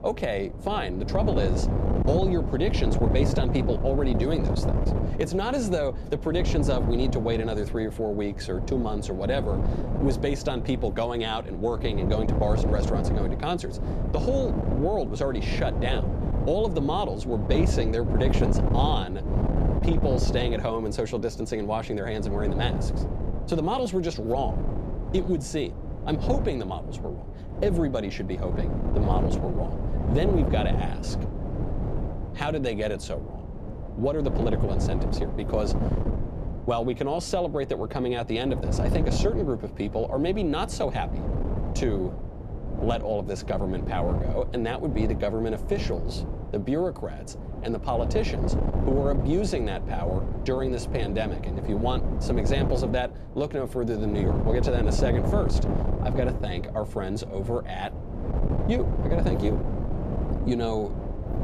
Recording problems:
wind noise on the microphone; heavy; 6 dB below the speech

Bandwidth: 14.5 kHz